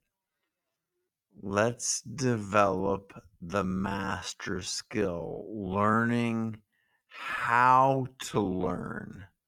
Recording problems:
wrong speed, natural pitch; too slow; 0.5 times normal speed

